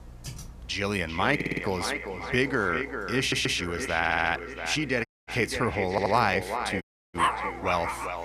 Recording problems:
echo of what is said; strong; throughout; 390 ms later, 7 dB below the speech
electrical hum; faint; throughout; 60 Hz, 30 dB below the speech
keyboard typing; faint; at the start; peak 15 dB below the speech
audio stuttering; 4 times, first at 1.5 s
audio cutting out; at 5 s and at 7 s
choppy; occasionally; at 6.5 s; 5% of the speech affected
dog barking; loud; at 7 s; peak 1 dB above the speech

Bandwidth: 14.5 kHz